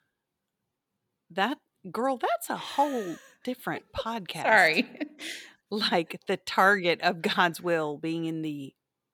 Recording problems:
none

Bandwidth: 18.5 kHz